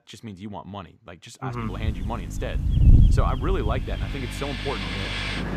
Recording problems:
train or aircraft noise; very loud; from 4.5 s on; 1 dB above the speech
wind noise on the microphone; heavy; from 2 to 4 s; 4 dB below the speech
electrical hum; noticeable; from 1.5 s on; 50 Hz, 10 dB below the speech

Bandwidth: 14.5 kHz